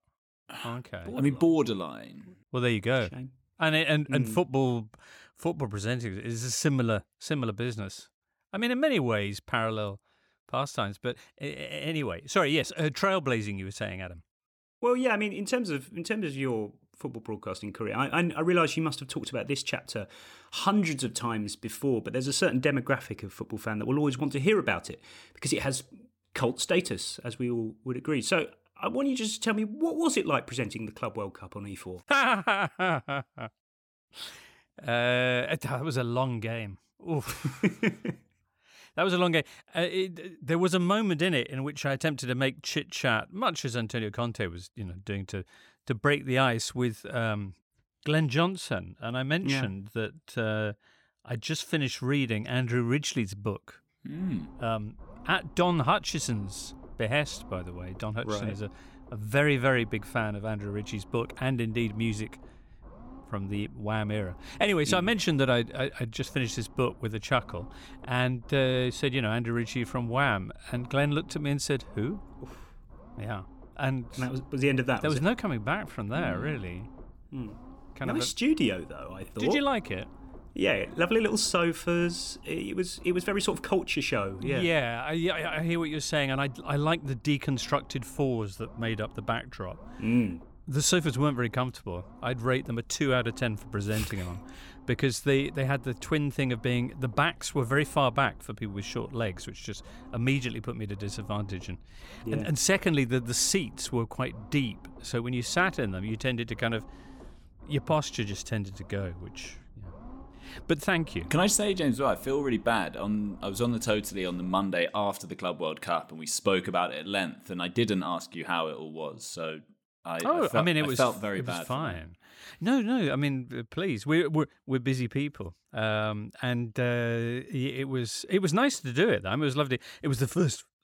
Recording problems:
low rumble; faint; from 54 s to 1:55; 25 dB below the speech

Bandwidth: 17.5 kHz